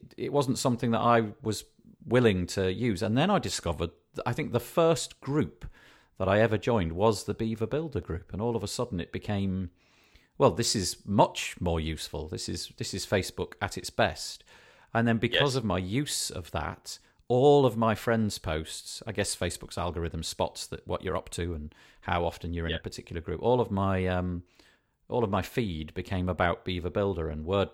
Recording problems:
none

